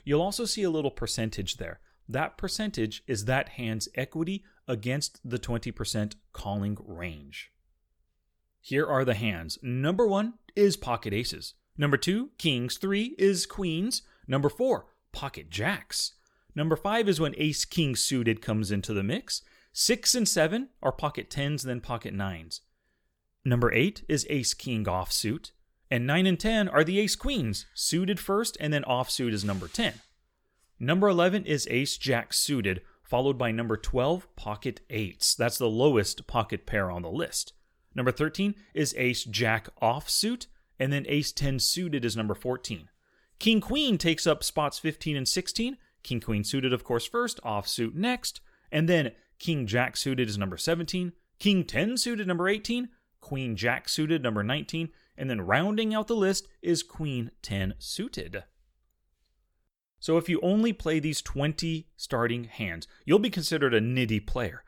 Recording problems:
none

